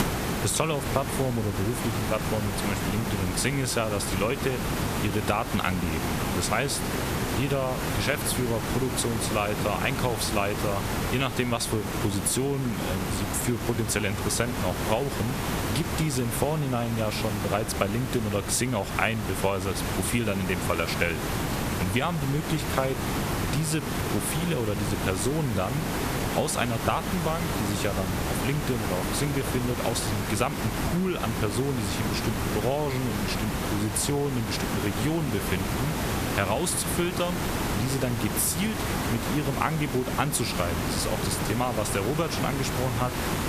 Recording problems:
squashed, flat; somewhat
hiss; loud; throughout; 2 dB below the speech

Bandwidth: 14.5 kHz